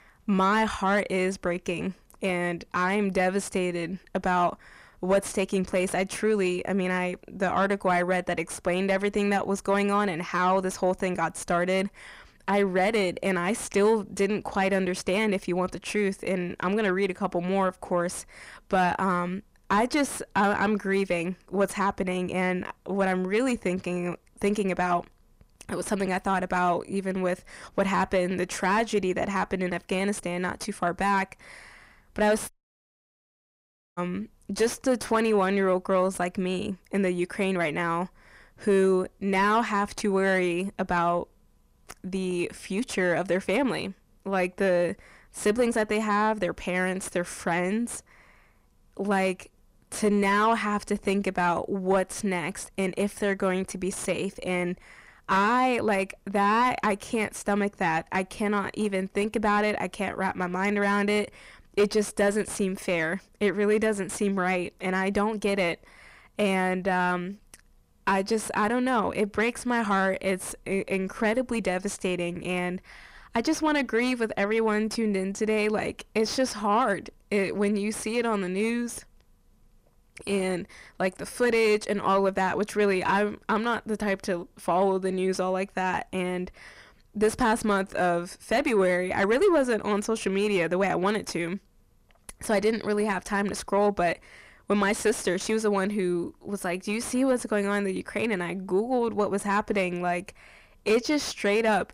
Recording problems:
distortion; slight; 10 dB below the speech
audio cutting out; at 33 s for 1.5 s

